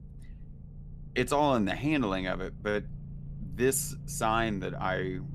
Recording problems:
low rumble; faint; throughout; 25 dB below the speech

